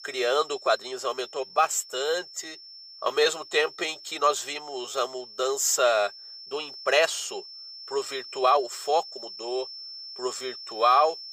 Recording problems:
thin; very; fading below 350 Hz
high-pitched whine; noticeable; throughout; 5.5 kHz, 15 dB below the speech
uneven, jittery; strongly; from 0.5 to 11 s

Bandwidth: 15 kHz